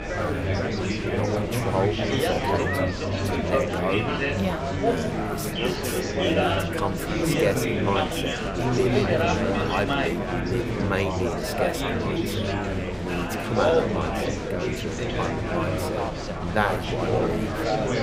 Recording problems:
chatter from many people; very loud; throughout; 5 dB above the speech

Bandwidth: 15.5 kHz